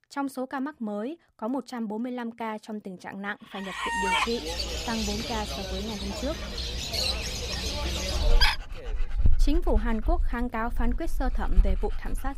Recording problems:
animal sounds; very loud; from 4.5 s on; 4 dB above the speech

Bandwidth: 15.5 kHz